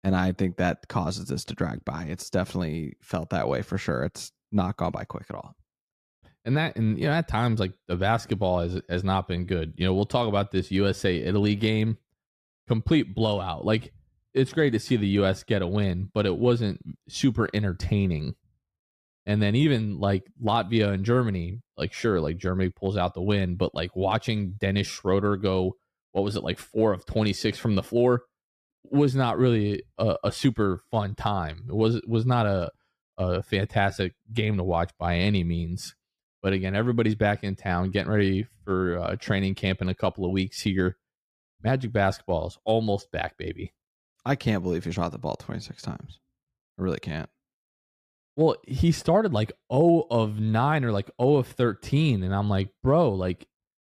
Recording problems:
none

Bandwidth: 14.5 kHz